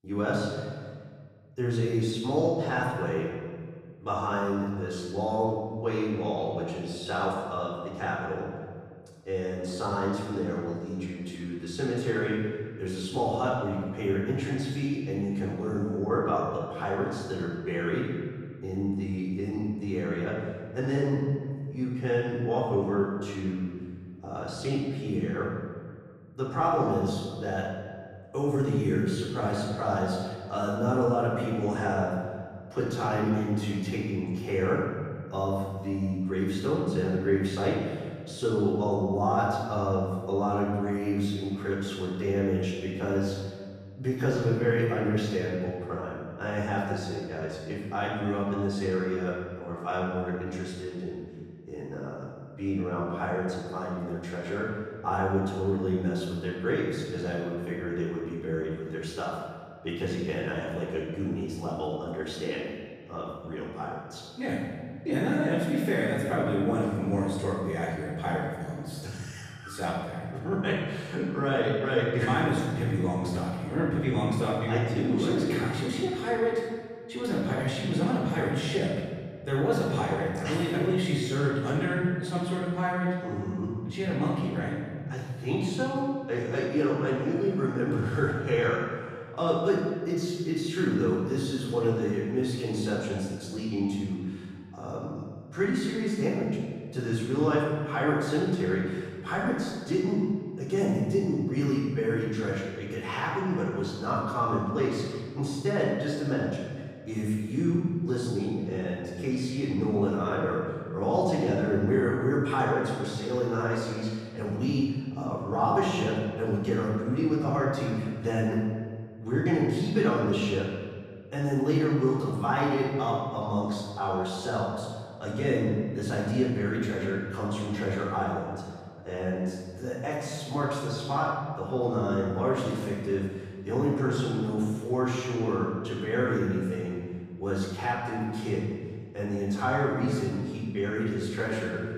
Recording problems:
room echo; strong; dies away in 1.6 s
off-mic speech; far

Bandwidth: 14.5 kHz